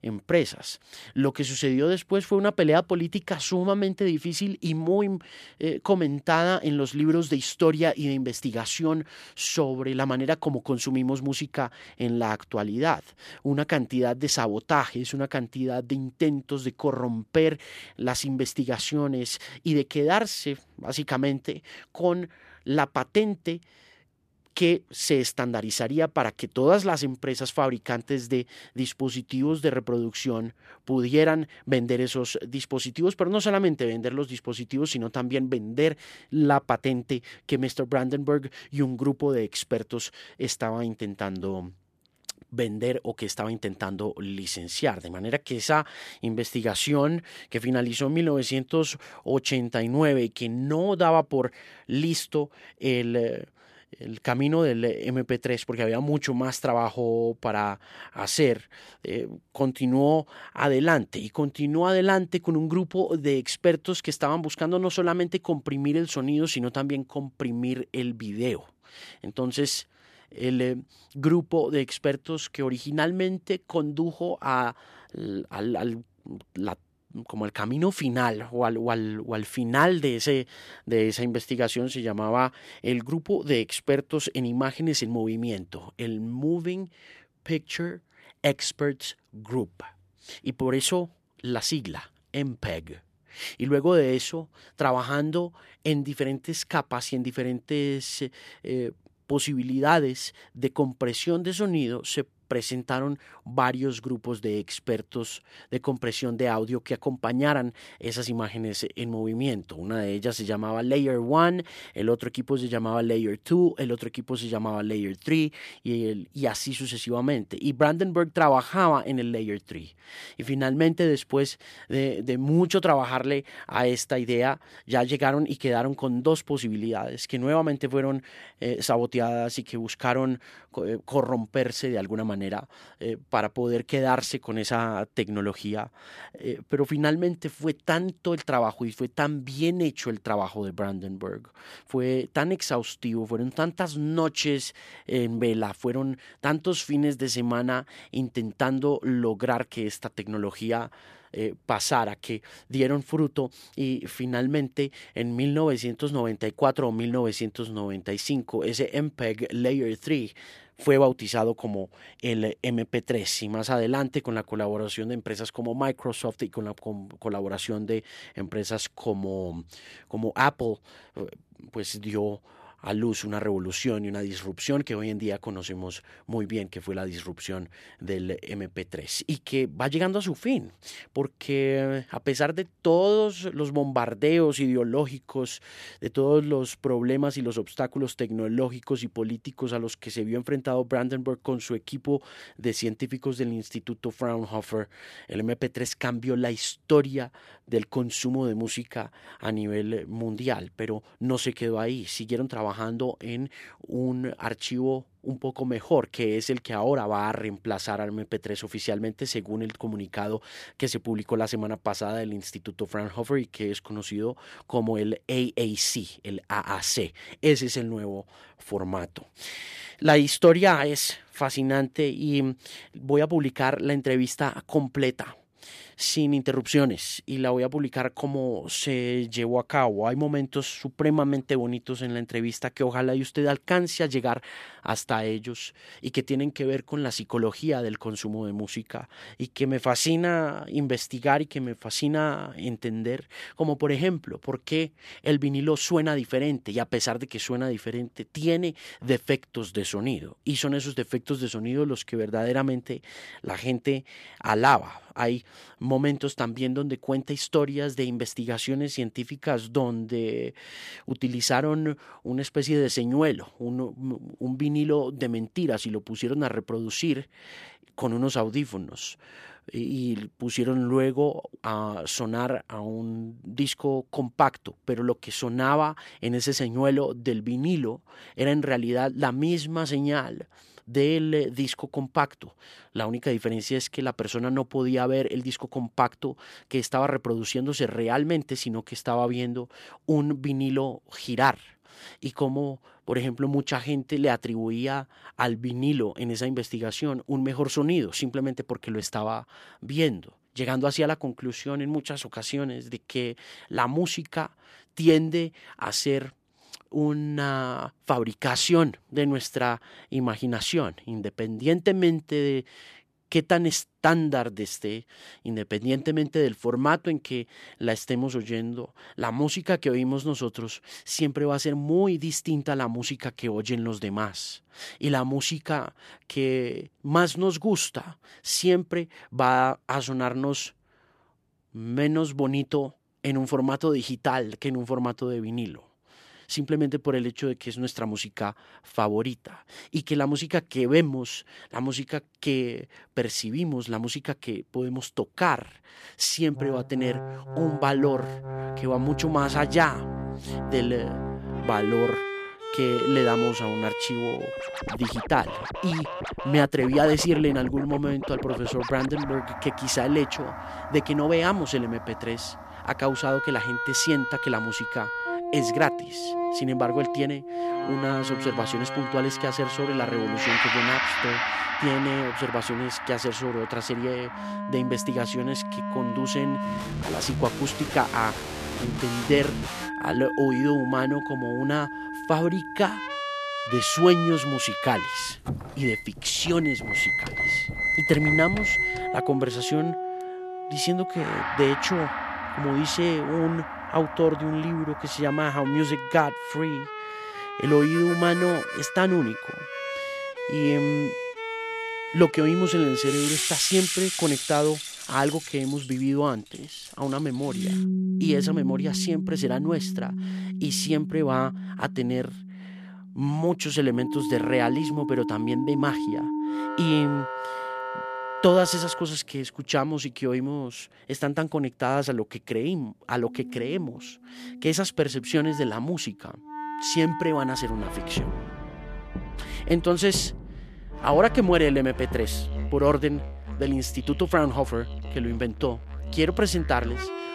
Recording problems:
background music; loud; from 5:46 on; 4 dB below the speech

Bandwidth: 14 kHz